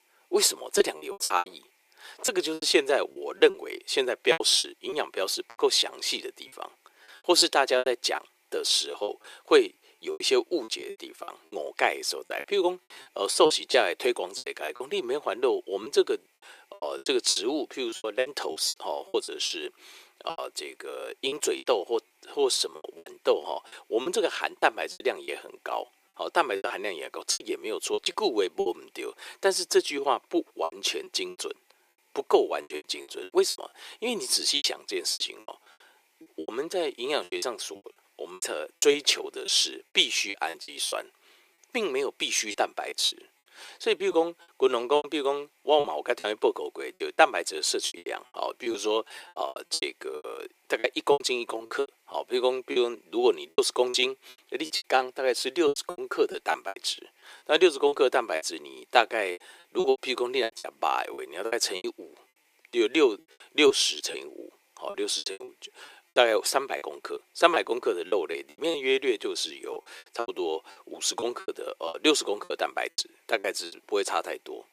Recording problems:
thin; very; fading below 350 Hz
choppy; very; 13% of the speech affected

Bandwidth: 15 kHz